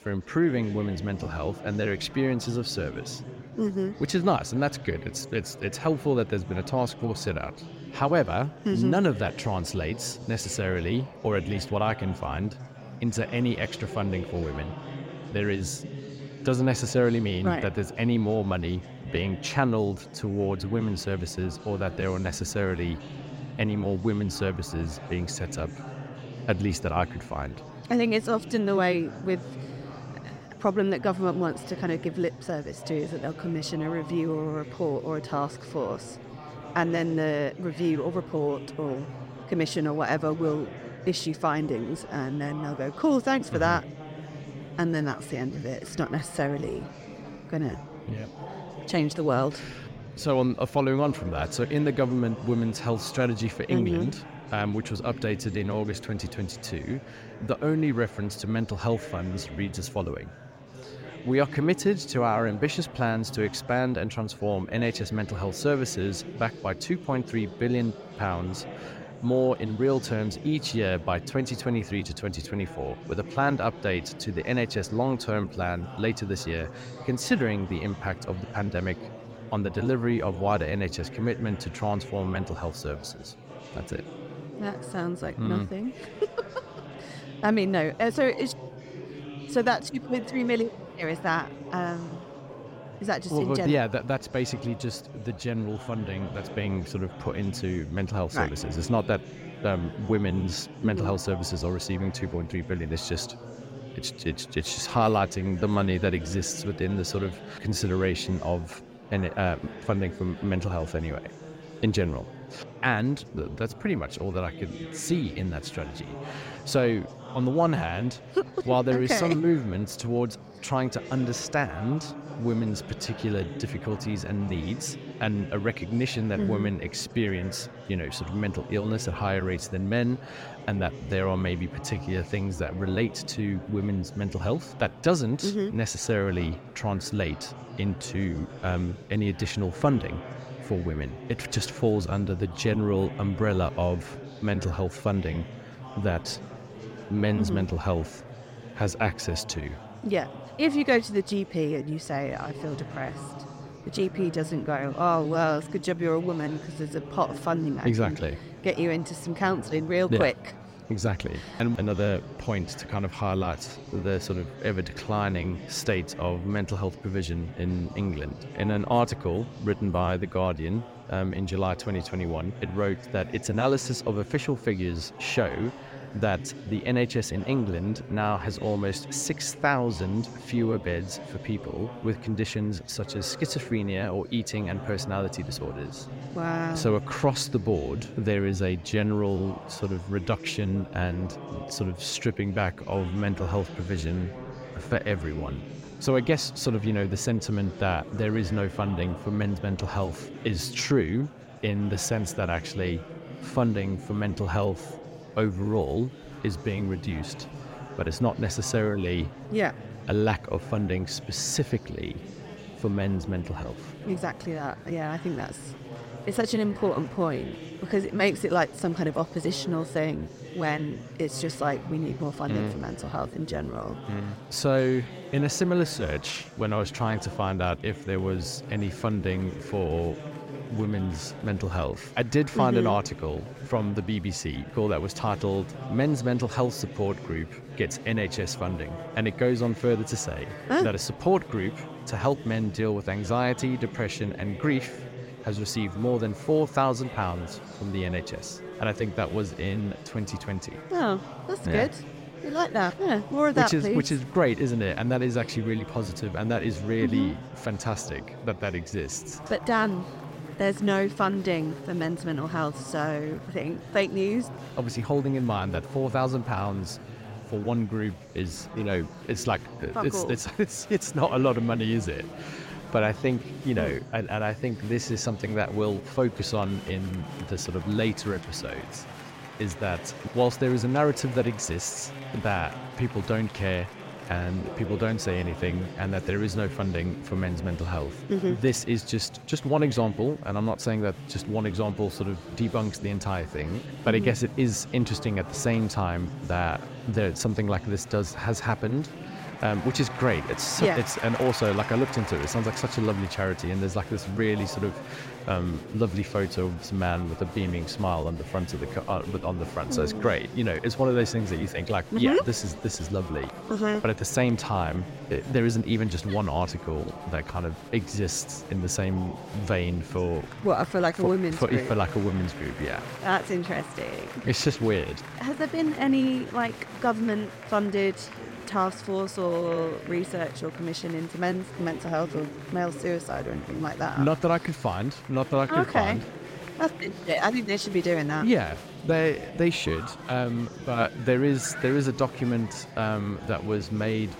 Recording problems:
murmuring crowd; noticeable; throughout; 15 dB below the speech

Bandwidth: 16 kHz